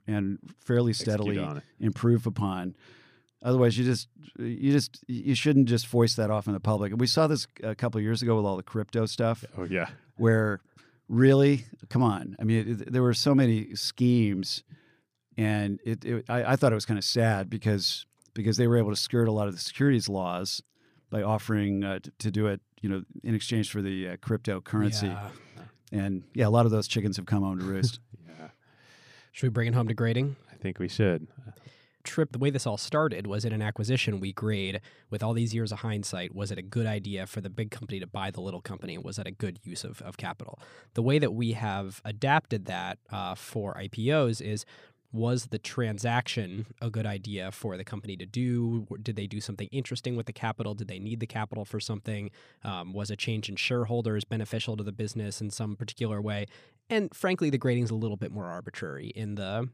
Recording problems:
none

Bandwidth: 15 kHz